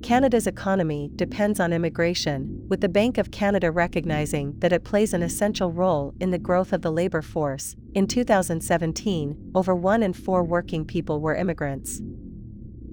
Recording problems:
low rumble; faint; throughout; 20 dB below the speech

